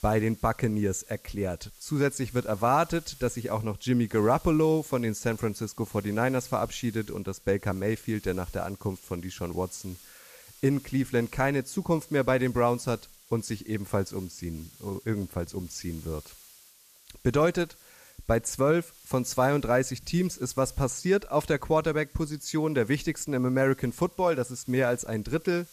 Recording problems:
hiss; faint; throughout; 20 dB below the speech

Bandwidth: 14.5 kHz